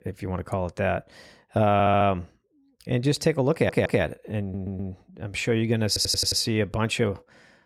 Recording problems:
audio stuttering; 4 times, first at 1.5 s

